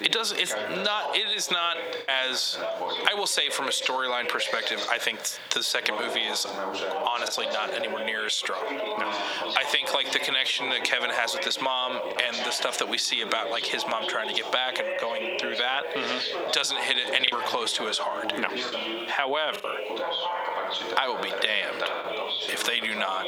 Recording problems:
squashed, flat; heavily, background pumping
thin; somewhat; fading below 750 Hz
background chatter; loud; throughout; 3 voices, 6 dB below the speech
choppy; occasionally; 1% of the speech affected

